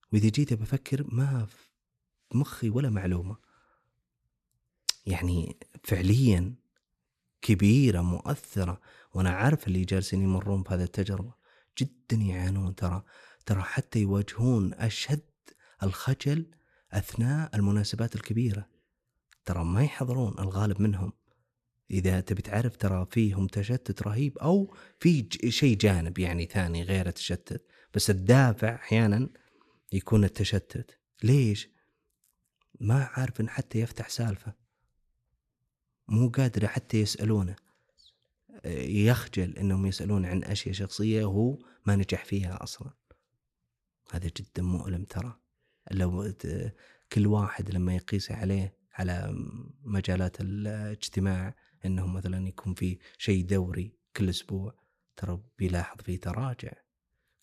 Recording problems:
none

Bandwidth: 14 kHz